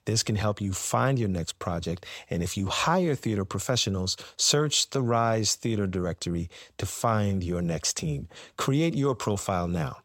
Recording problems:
none

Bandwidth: 16 kHz